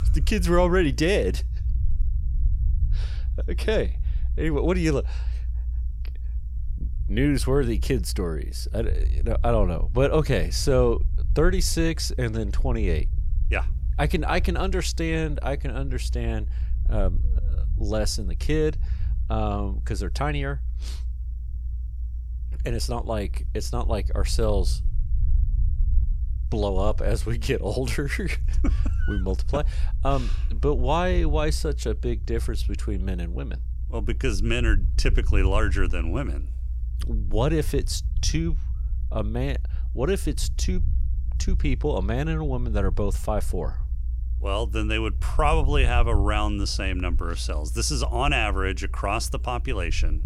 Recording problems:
low rumble; faint; throughout; 20 dB below the speech

